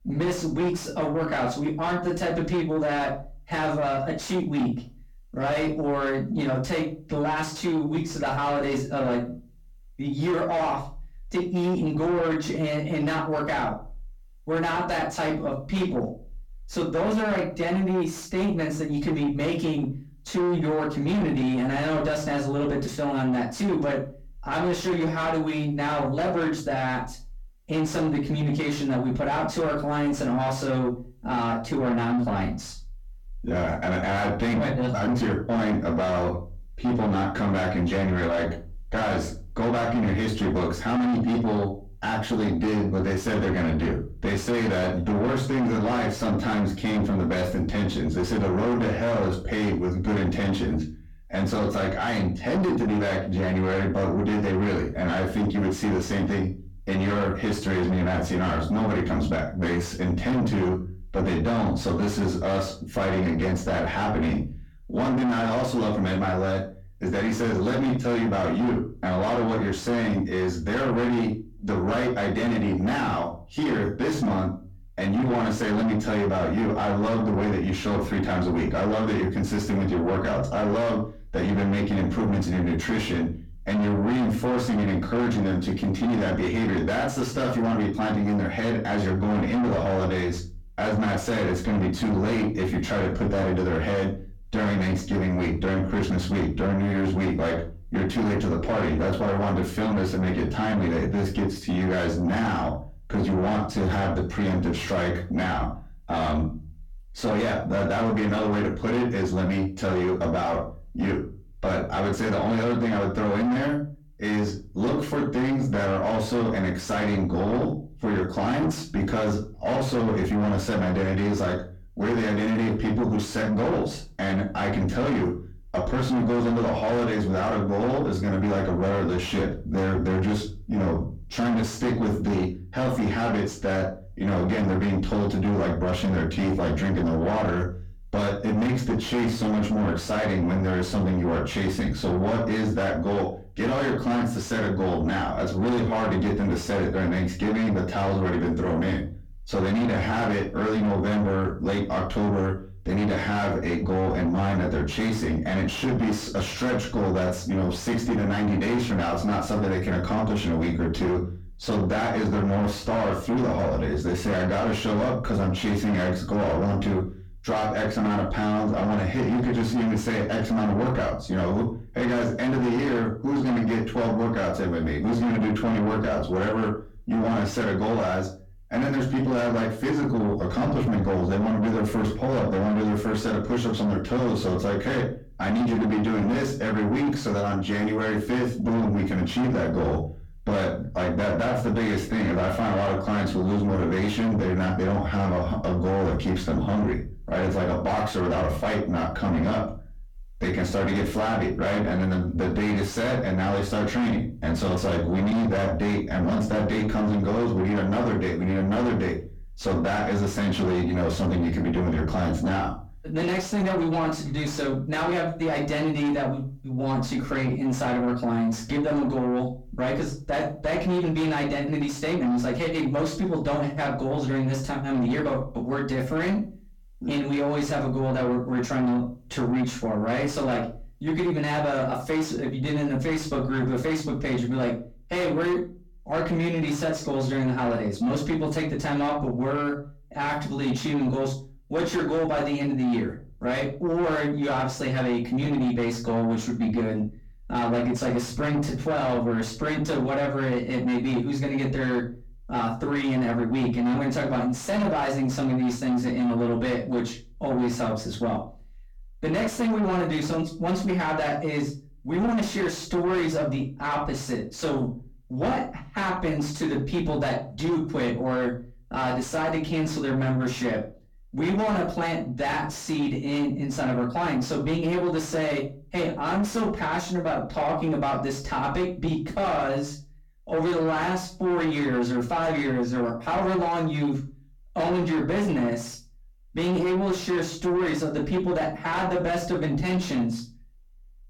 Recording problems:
distortion; heavy; 6 dB below the speech
off-mic speech; far
room echo; slight; dies away in 0.3 s

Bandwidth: 18 kHz